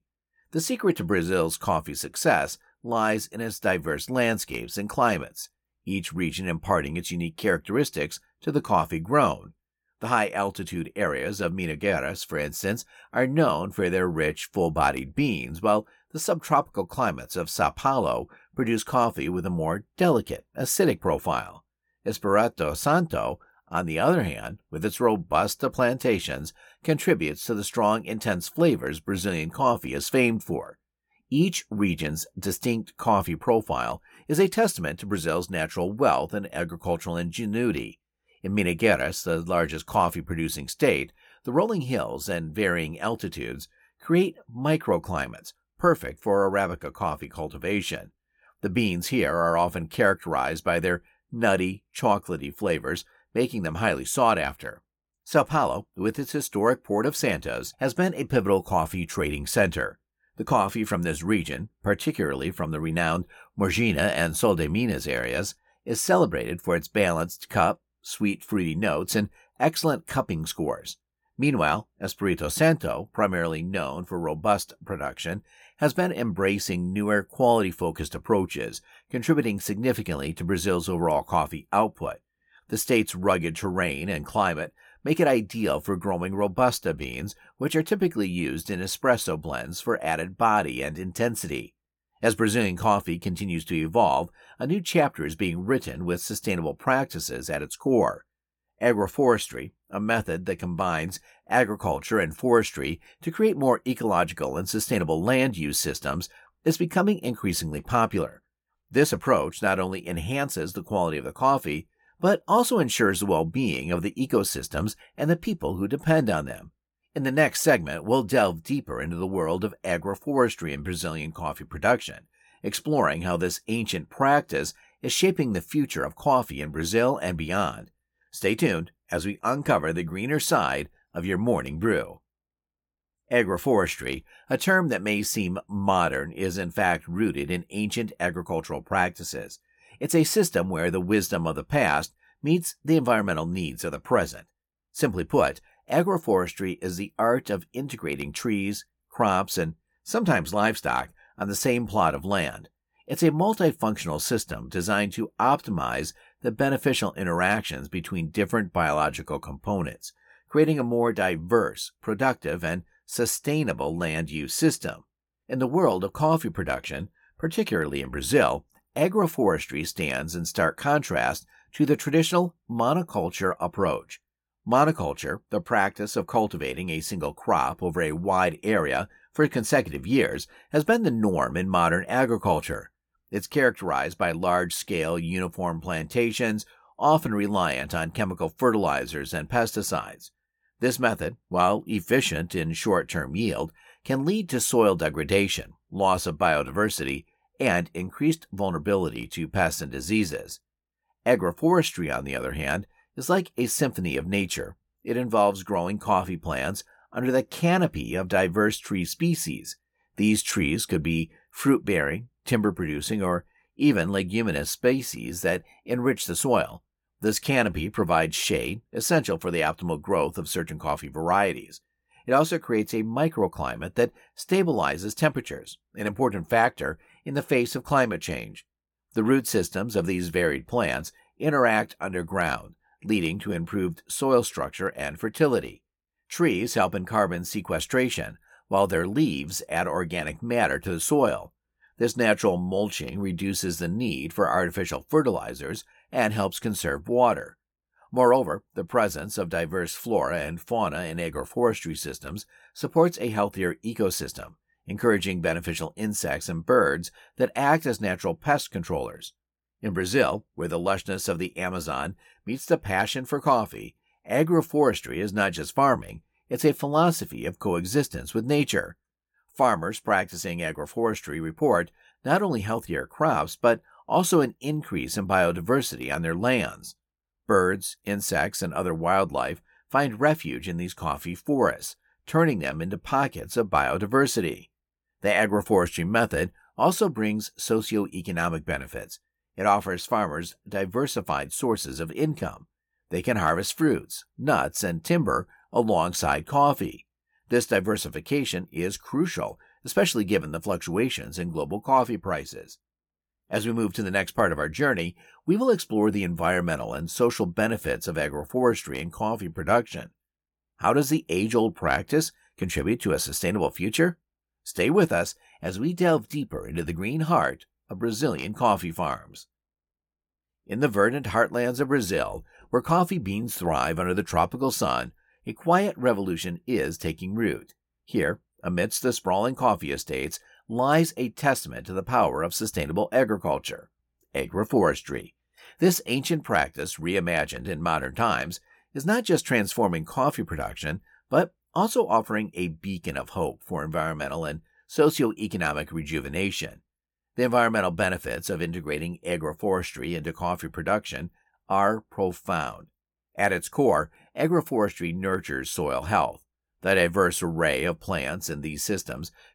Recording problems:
none

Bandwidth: 17.5 kHz